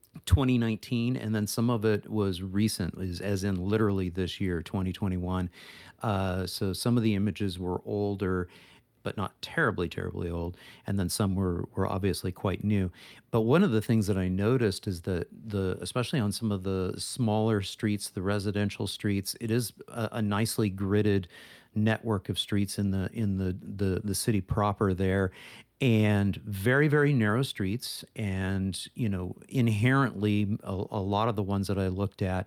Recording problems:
none

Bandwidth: 19 kHz